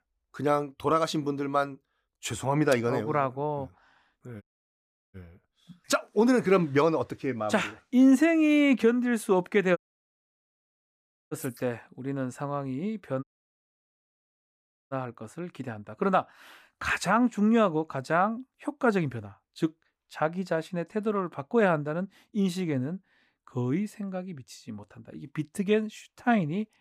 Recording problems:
audio cutting out; at 4.5 s for 0.5 s, at 10 s for 1.5 s and at 13 s for 1.5 s

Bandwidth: 15 kHz